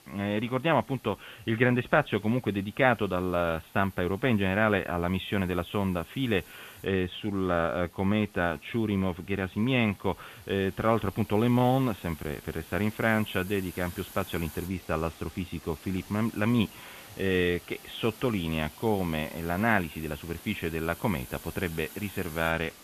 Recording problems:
high frequencies cut off; severe; nothing above 3.5 kHz
hiss; noticeable; throughout; 20 dB below the speech

